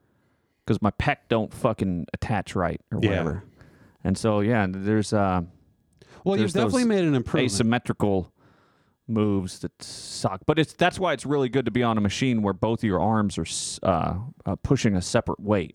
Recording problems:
none

